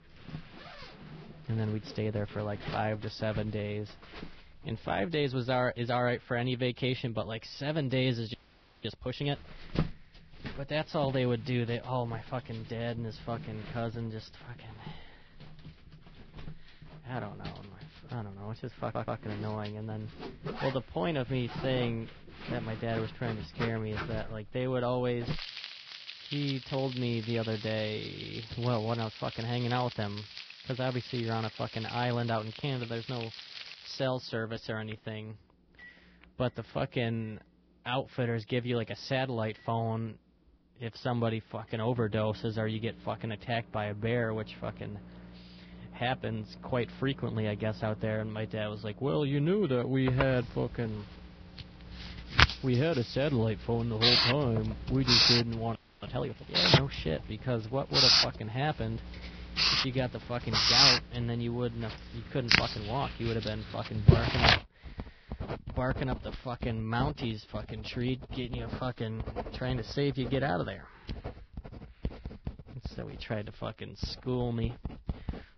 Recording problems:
garbled, watery; badly; nothing above 5.5 kHz
household noises; very loud; throughout; 3 dB above the speech
audio freezing; at 8.5 s for 0.5 s and at 56 s
audio stuttering; at 19 s

